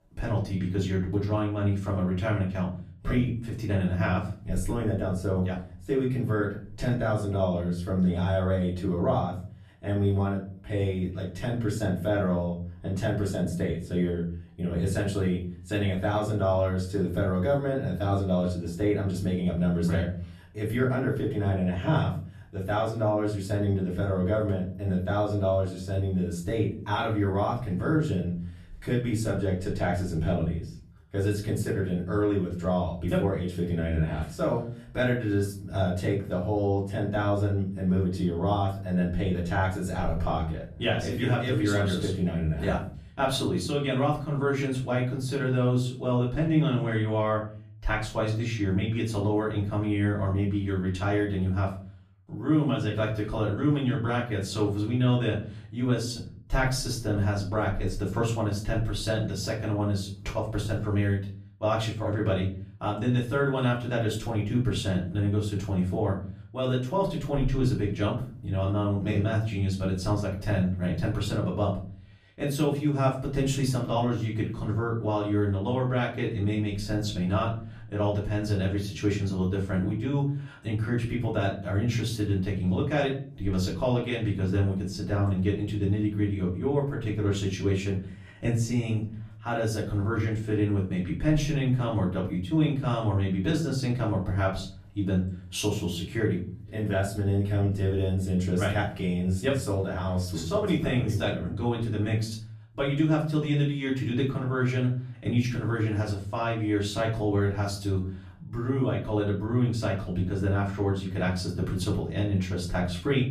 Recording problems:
off-mic speech; far
room echo; slight; dies away in 0.5 s

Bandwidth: 14.5 kHz